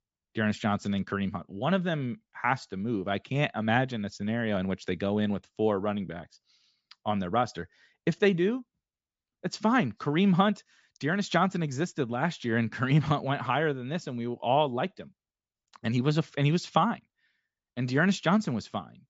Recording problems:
high frequencies cut off; noticeable; nothing above 8 kHz

